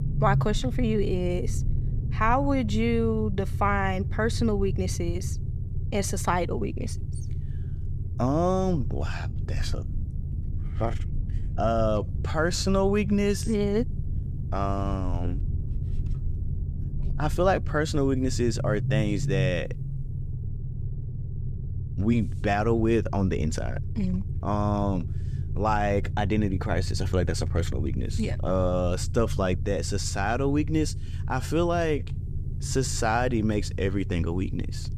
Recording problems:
low rumble; noticeable; throughout; 15 dB below the speech

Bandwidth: 14.5 kHz